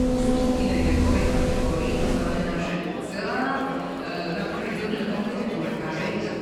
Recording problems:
room echo; strong; dies away in 1.9 s
off-mic speech; far
background music; very loud; until 2.5 s; 4 dB above the speech
murmuring crowd; loud; throughout; 4 dB below the speech

